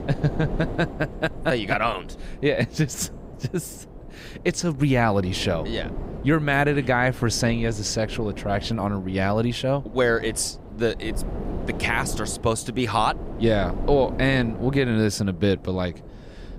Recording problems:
wind noise on the microphone; occasional gusts; 15 dB below the speech

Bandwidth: 15.5 kHz